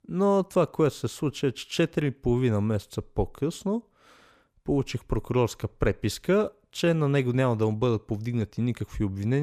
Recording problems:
abrupt cut into speech; at the end

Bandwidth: 14.5 kHz